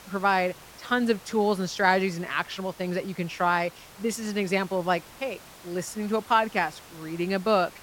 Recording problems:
hiss; faint; throughout; 20 dB below the speech

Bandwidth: 16.5 kHz